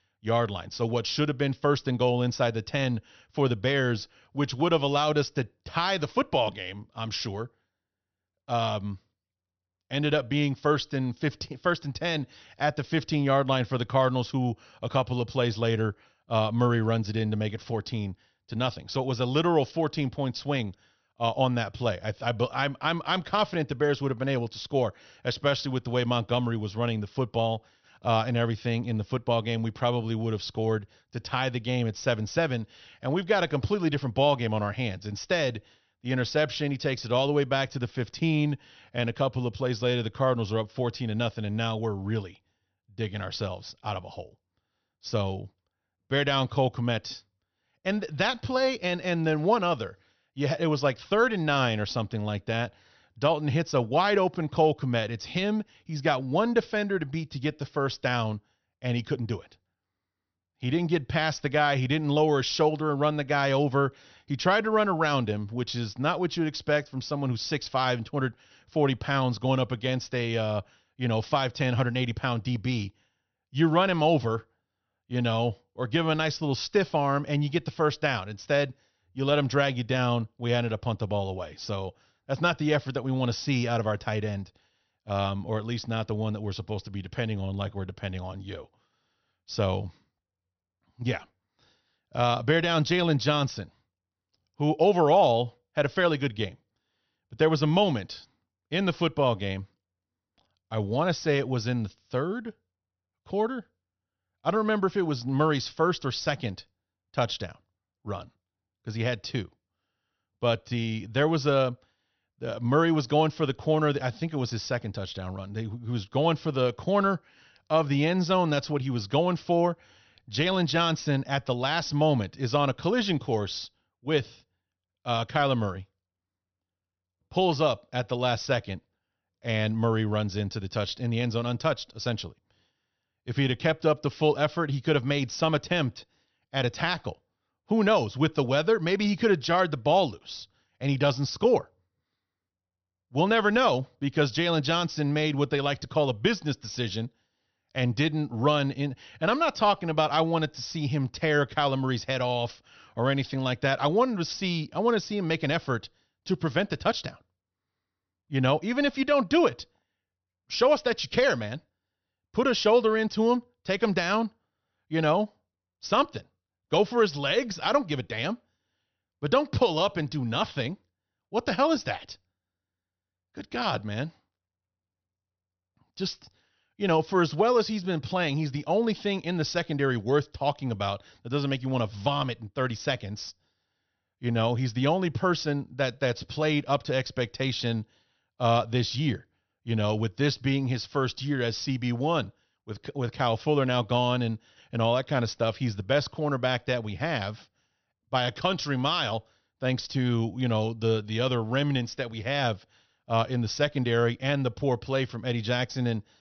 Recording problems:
high frequencies cut off; noticeable; nothing above 6 kHz

